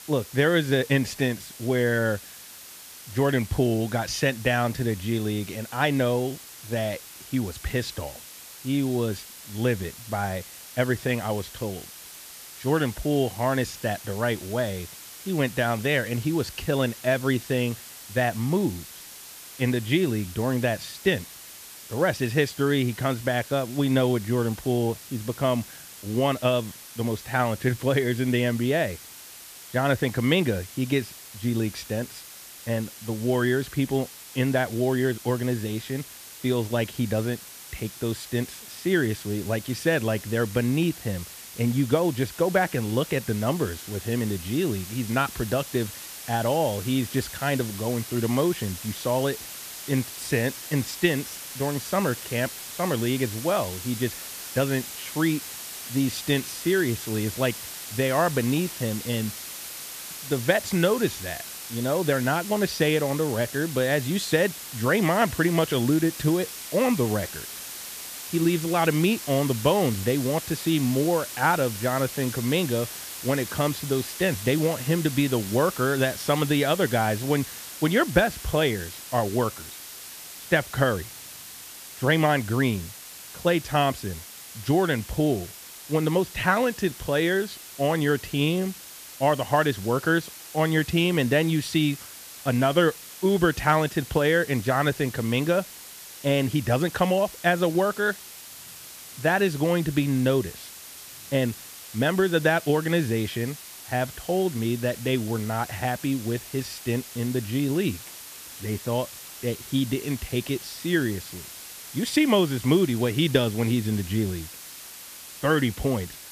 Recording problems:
hiss; noticeable; throughout; 10 dB below the speech

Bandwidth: 14.5 kHz